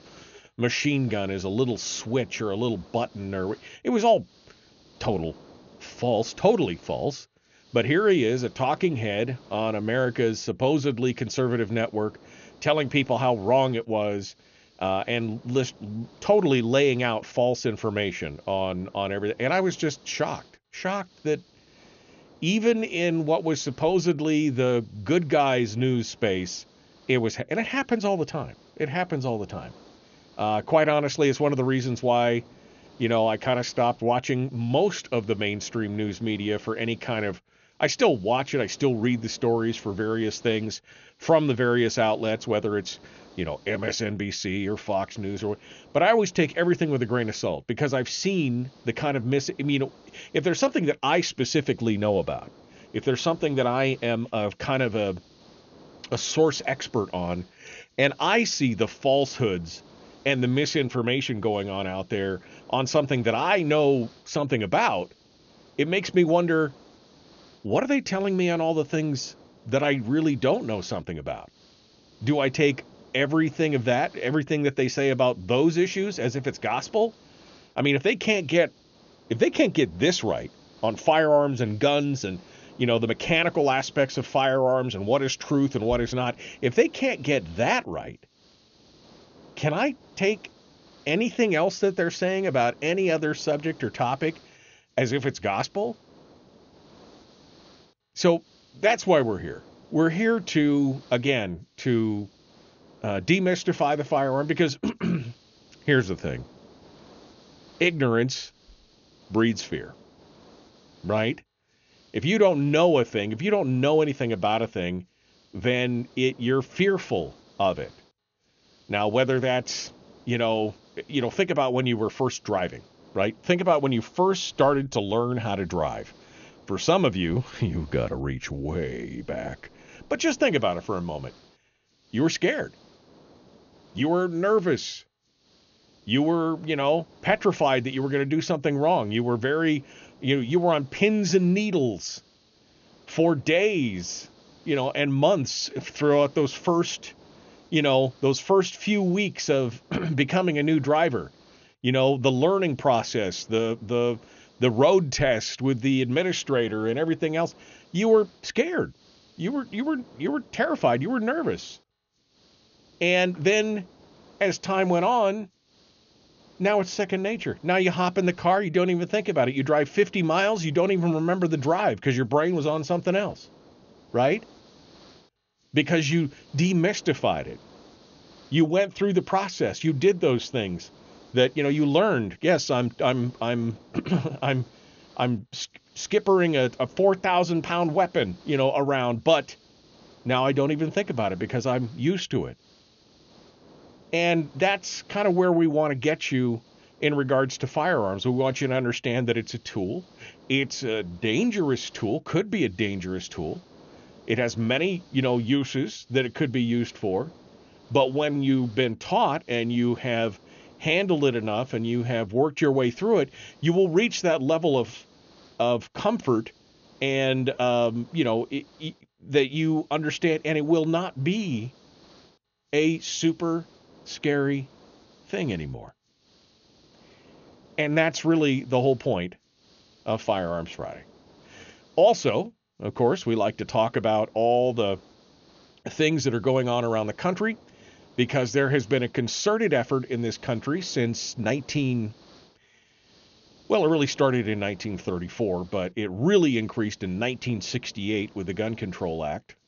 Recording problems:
high frequencies cut off; noticeable; nothing above 6.5 kHz
hiss; faint; throughout; 30 dB below the speech

